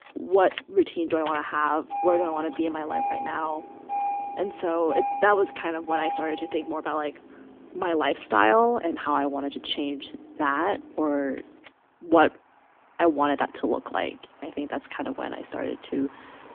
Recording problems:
phone-call audio; nothing above 3 kHz
traffic noise; loud; throughout; 8 dB below the speech

